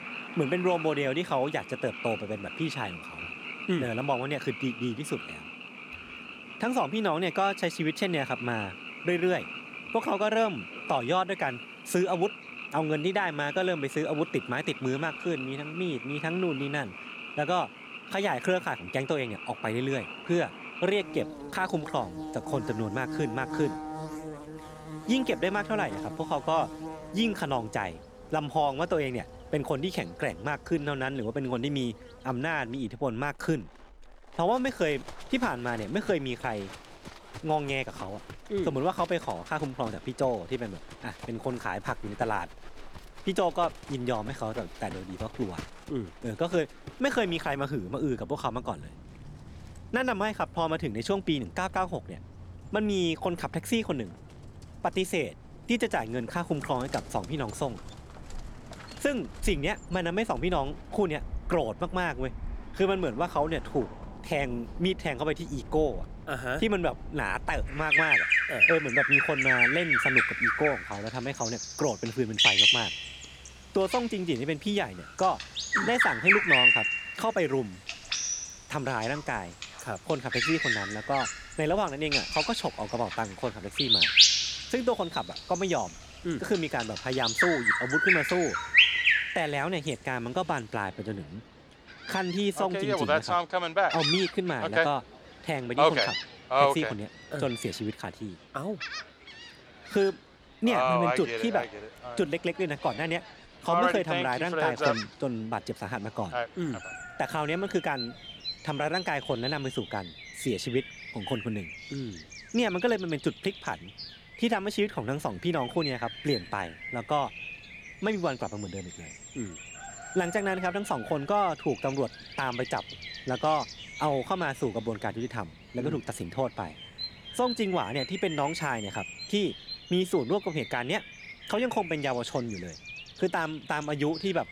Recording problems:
animal sounds; very loud; throughout; 2 dB above the speech

